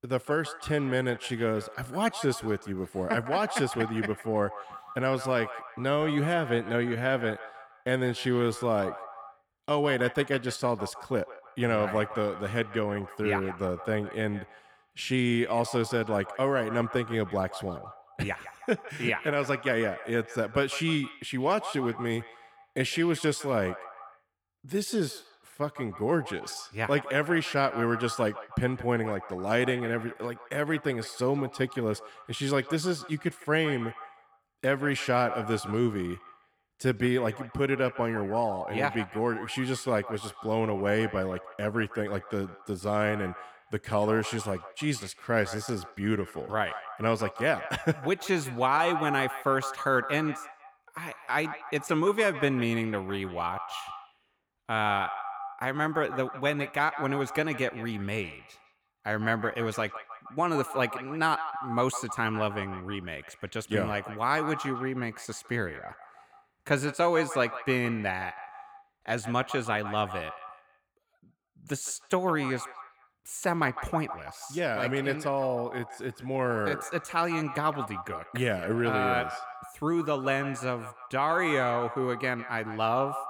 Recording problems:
echo of what is said; noticeable; throughout; 160 ms later, 10 dB below the speech

